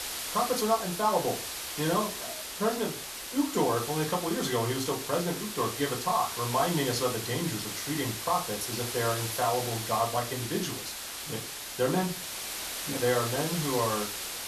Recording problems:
off-mic speech; far
room echo; very slight; dies away in 0.2 s
hiss; loud; throughout; 4 dB below the speech

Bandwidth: 13.5 kHz